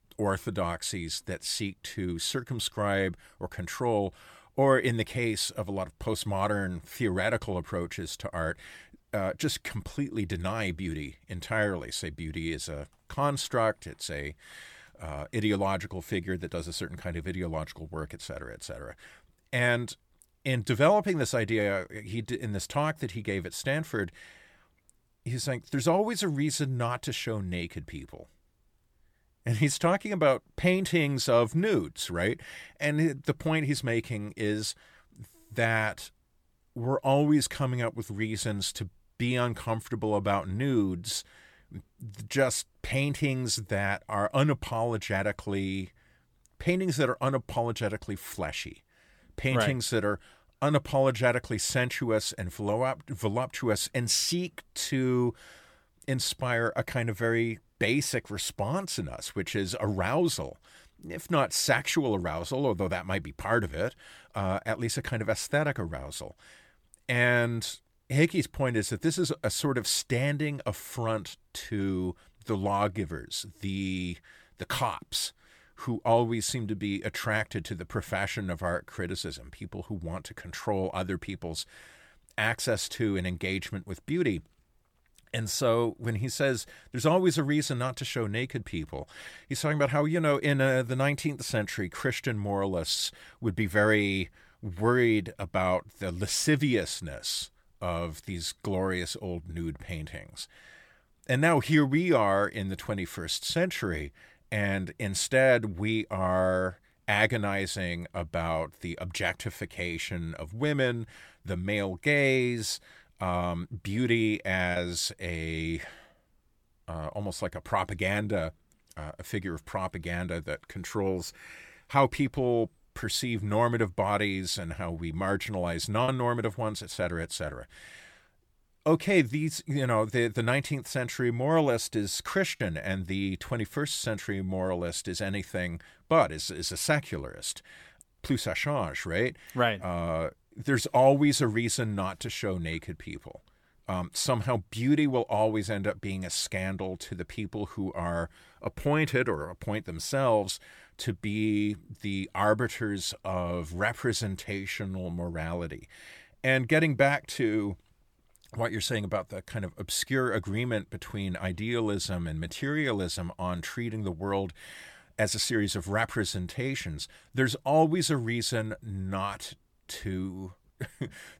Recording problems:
choppy; occasionally; at 1:55, at 2:06 and at 2:13; 1% of the speech affected

